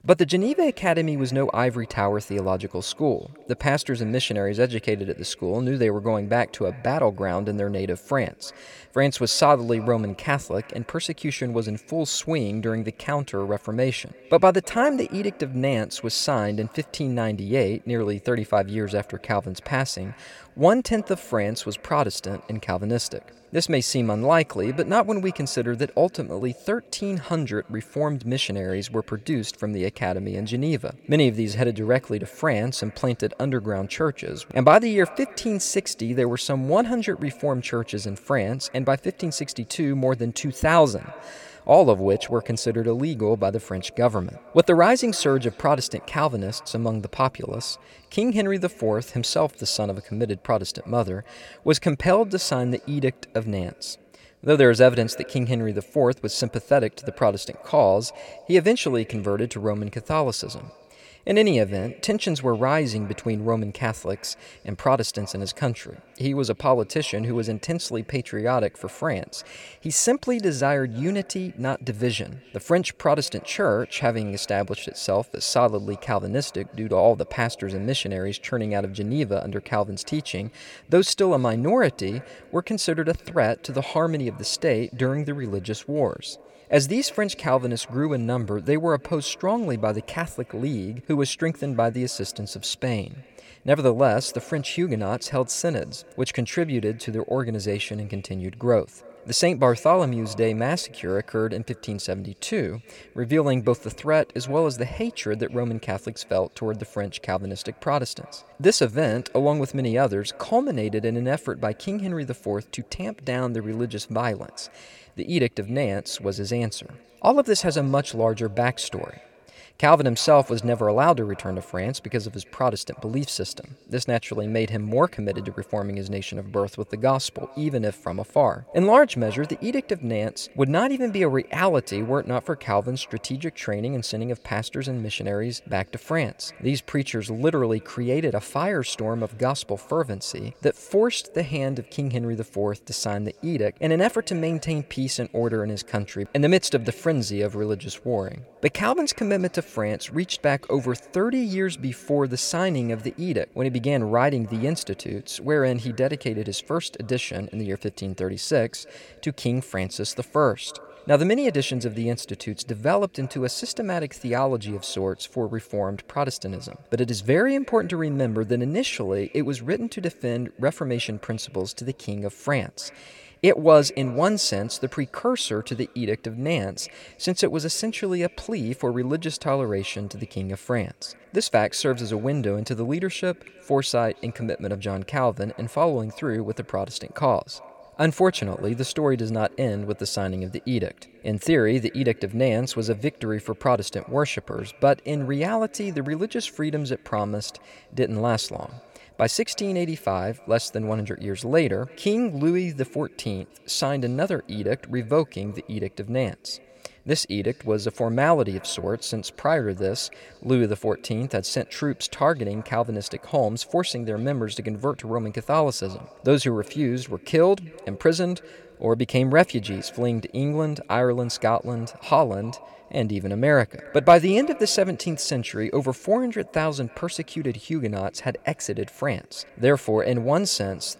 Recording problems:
echo of what is said; faint; throughout; 310 ms later, 25 dB below the speech

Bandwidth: 17 kHz